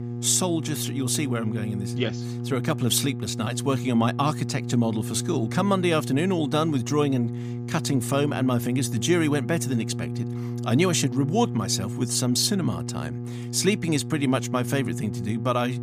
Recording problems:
electrical hum; noticeable; throughout; 60 Hz, 10 dB below the speech

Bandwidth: 15 kHz